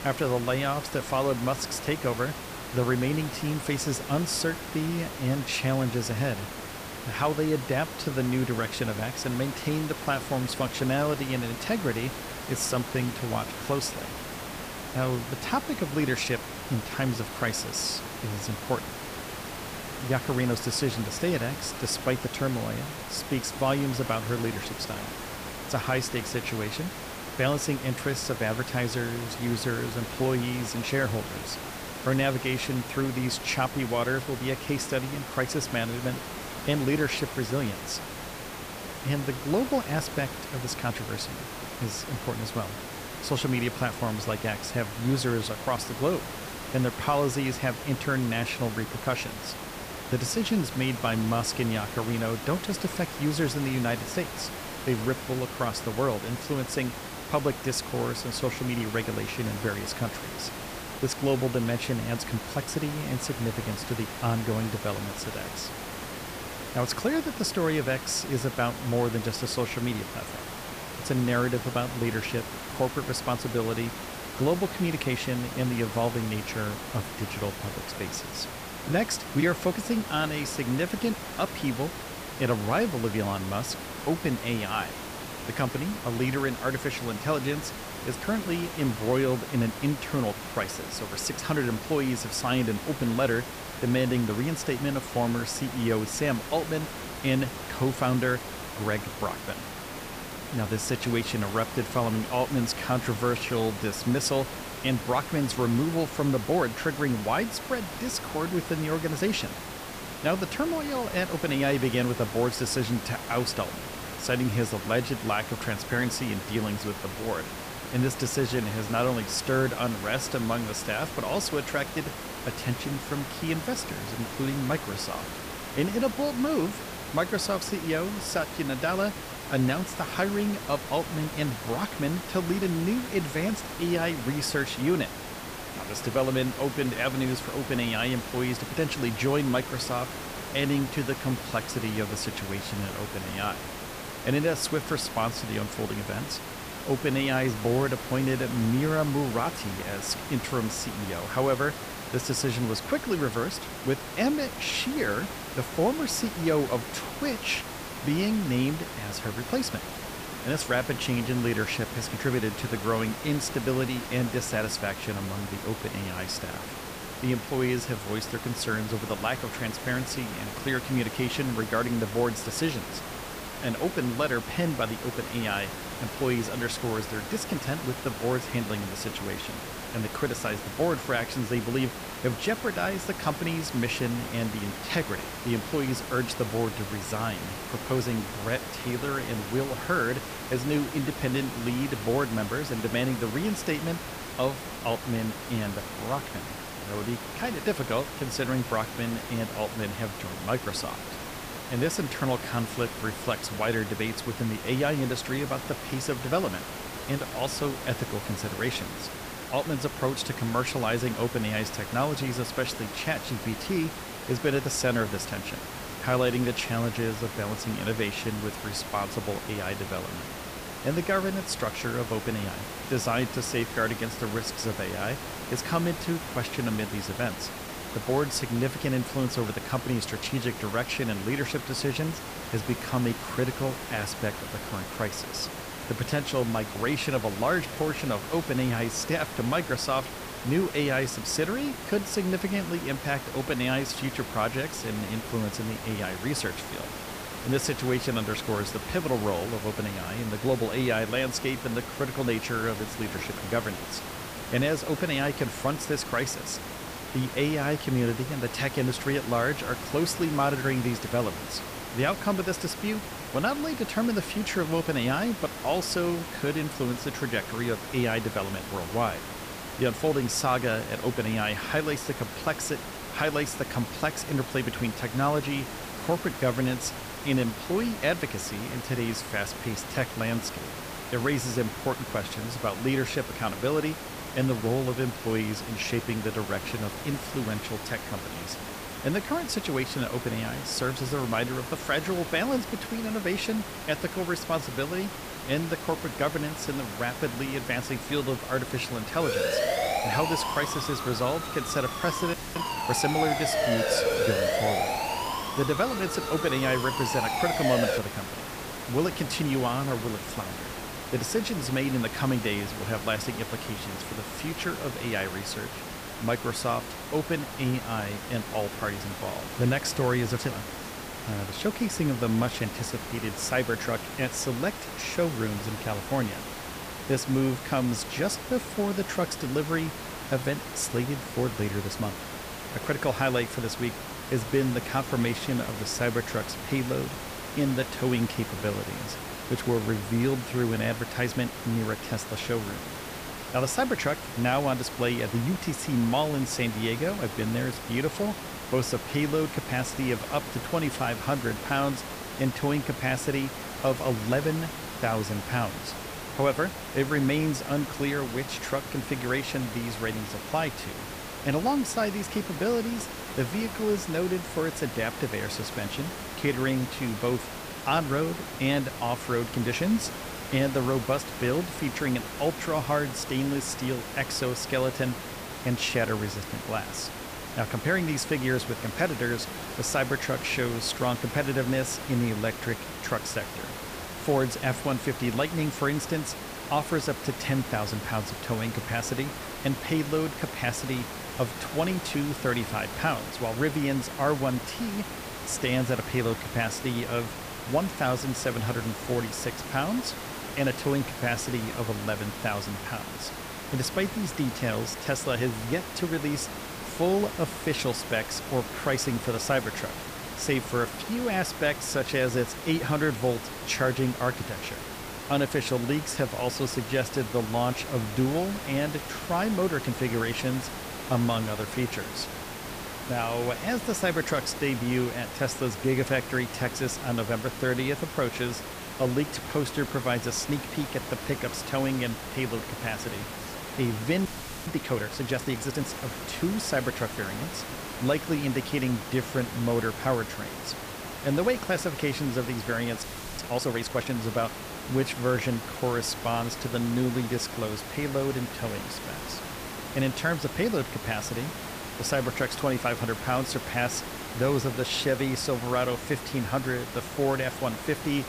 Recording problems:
hiss; loud; throughout; 7 dB below the speech
siren; loud; from 4:59 to 5:08; peak 4 dB above the speech
audio freezing; at 5:02, at 7:14 and at 7:23

